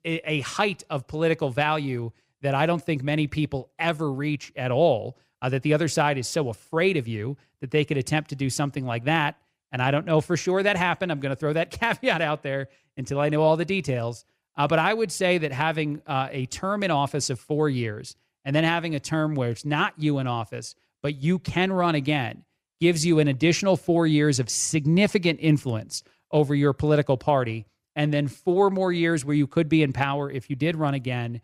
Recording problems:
none

